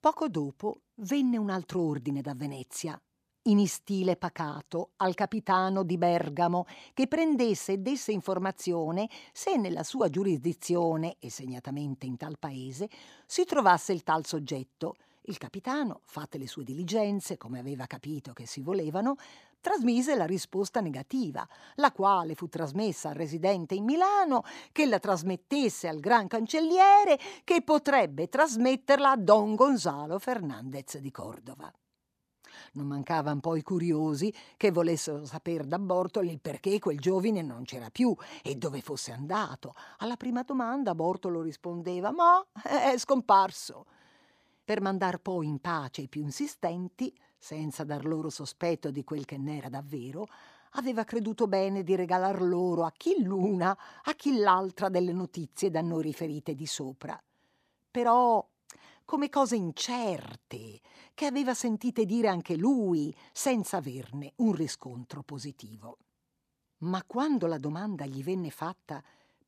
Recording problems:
none

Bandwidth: 15 kHz